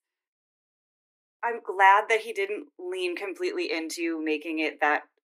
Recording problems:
thin; very; fading below 300 Hz

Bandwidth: 15 kHz